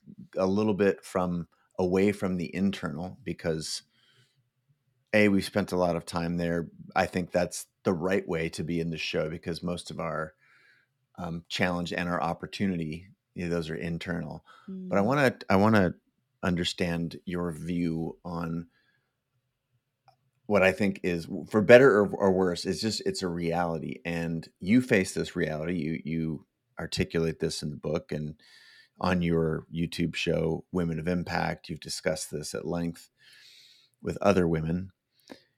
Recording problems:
none

